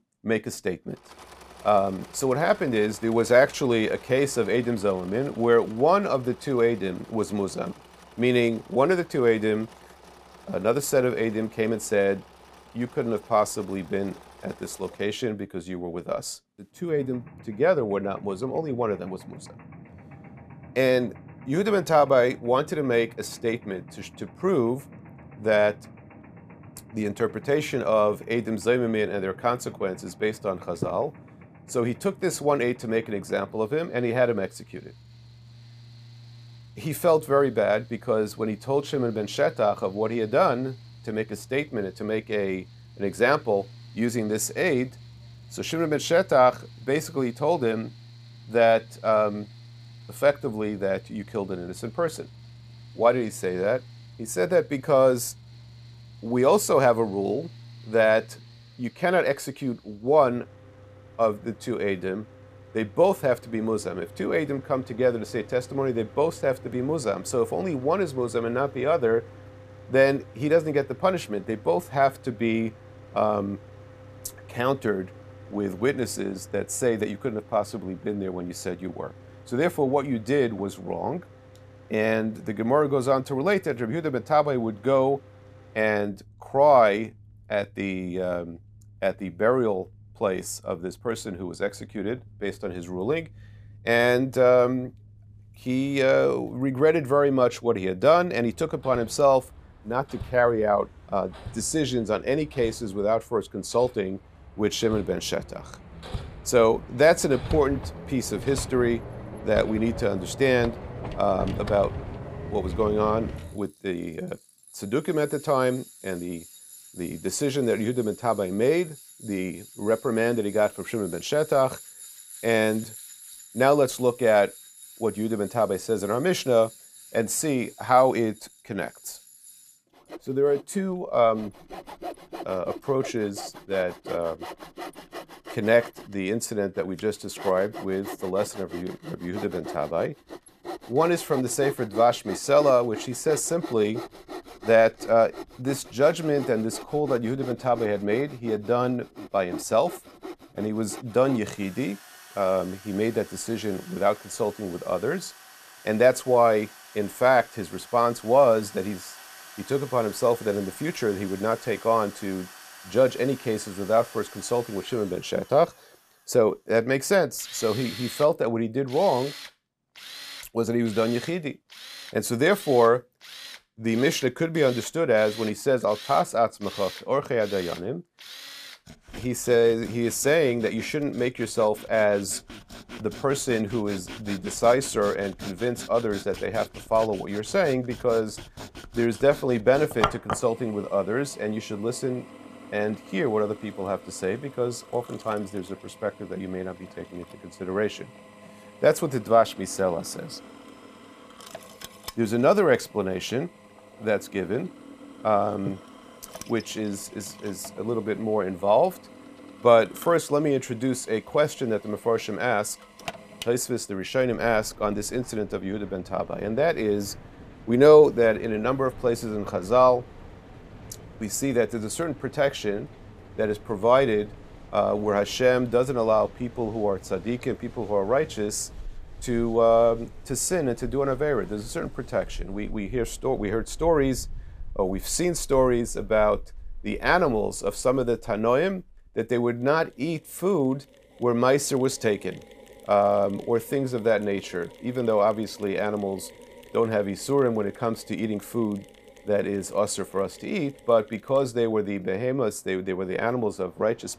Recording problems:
machinery noise; noticeable; throughout; 20 dB below the speech

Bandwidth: 14.5 kHz